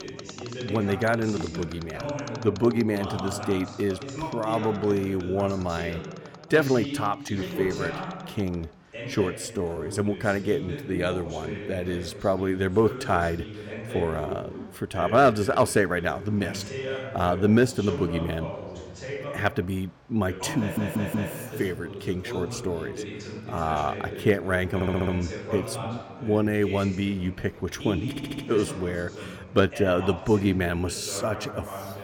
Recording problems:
background chatter; loud; throughout; 2 voices, 9 dB below the speech
machinery noise; faint; throughout; 25 dB below the speech
uneven, jittery; slightly; from 4.5 to 10 s
audio stuttering; at 21 s, at 25 s and at 28 s

